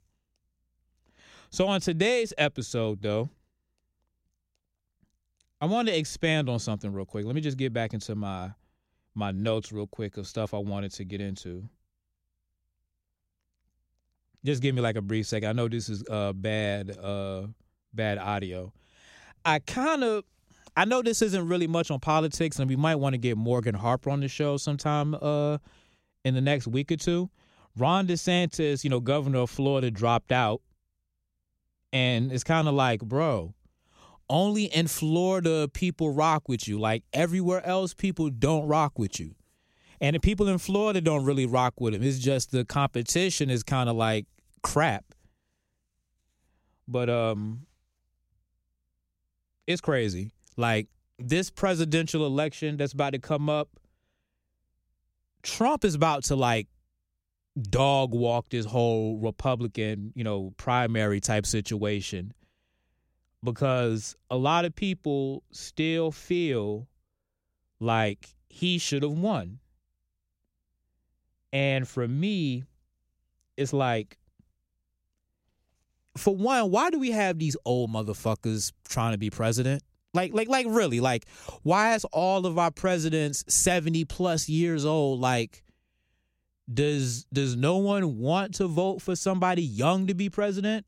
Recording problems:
none

